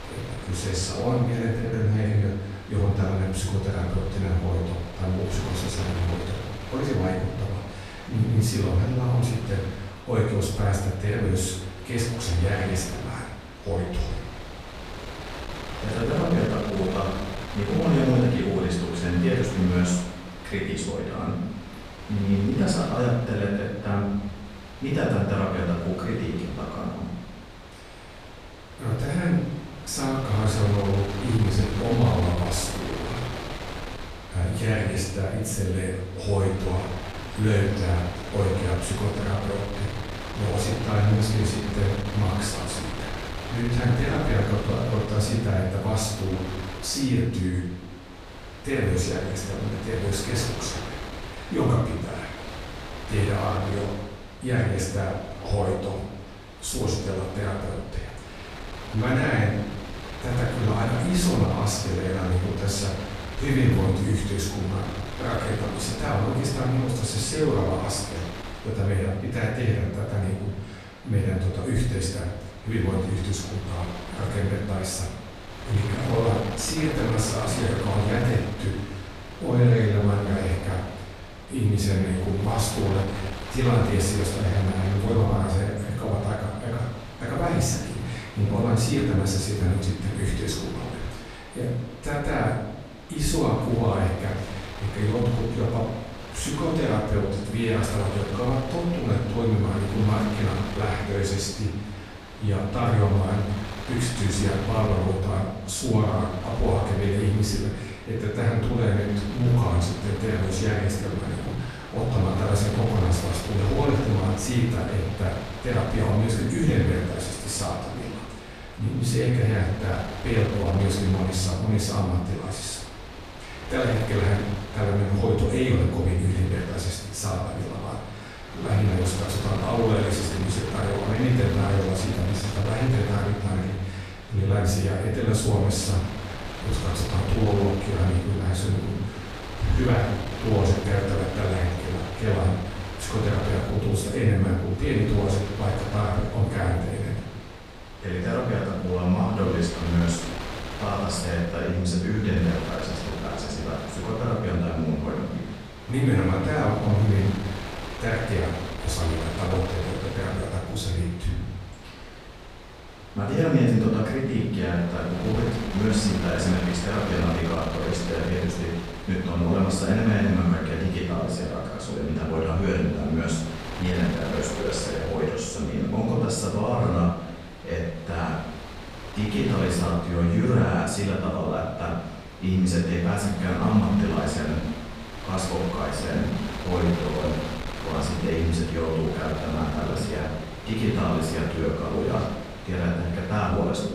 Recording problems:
off-mic speech; far
room echo; noticeable; dies away in 0.9 s
wind noise on the microphone; heavy; 8 dB below the speech

